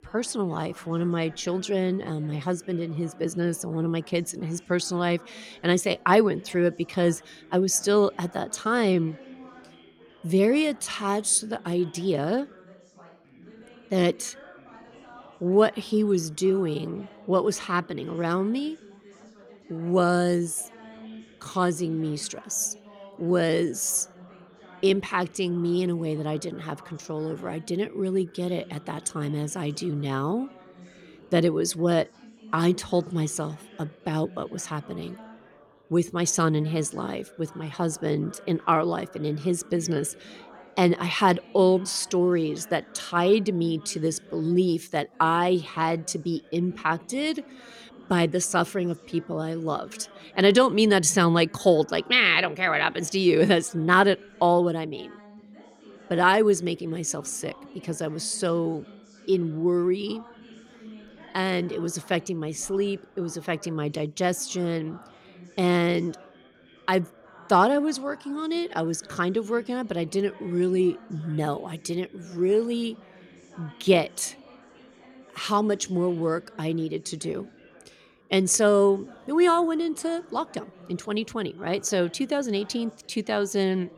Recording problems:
background chatter; faint; throughout; 4 voices, 25 dB below the speech

